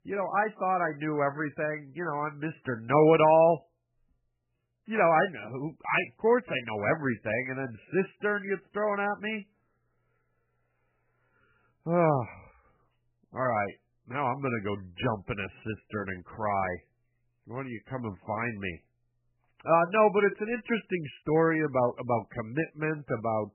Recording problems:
garbled, watery; badly; nothing above 3 kHz

